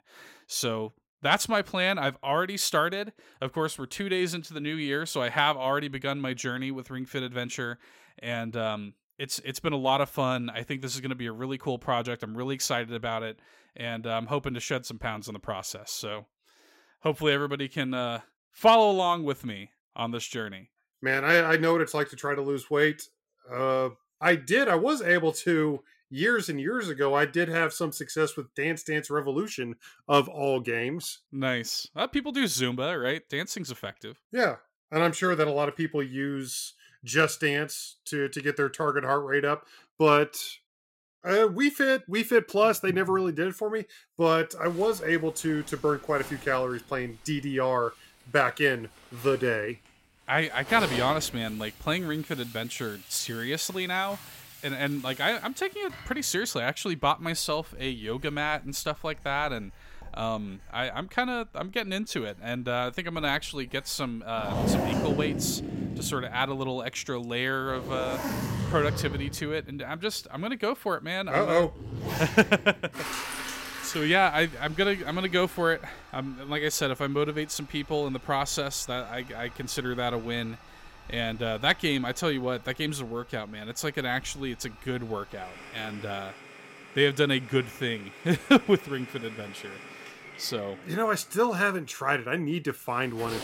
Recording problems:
household noises; noticeable; from 45 s on; 10 dB below the speech

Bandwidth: 16 kHz